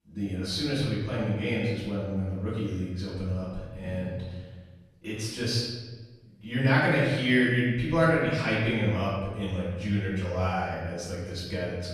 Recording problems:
room echo; strong; dies away in 1.2 s
off-mic speech; far

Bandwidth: 13.5 kHz